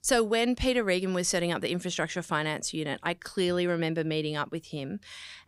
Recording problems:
none

